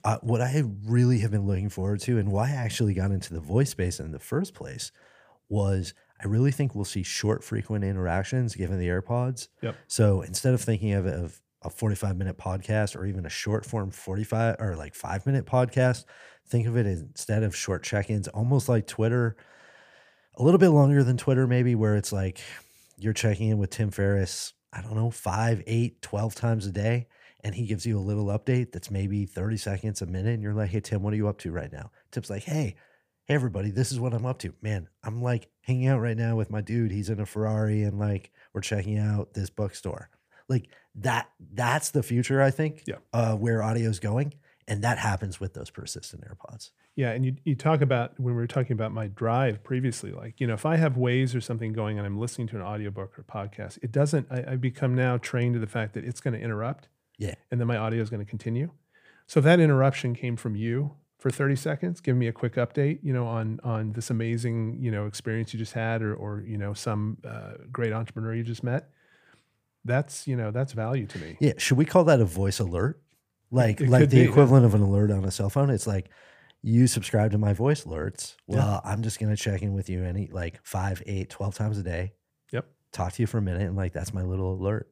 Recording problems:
none

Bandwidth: 15 kHz